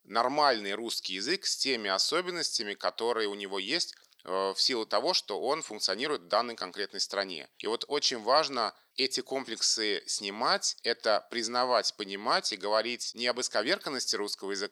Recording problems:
thin; somewhat; fading below 500 Hz

